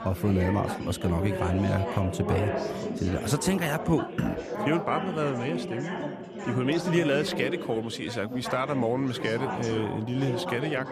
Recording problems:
chatter from many people; loud; throughout; 5 dB below the speech

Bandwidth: 14.5 kHz